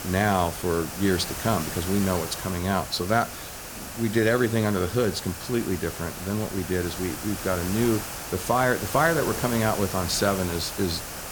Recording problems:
hiss; loud; throughout; 7 dB below the speech

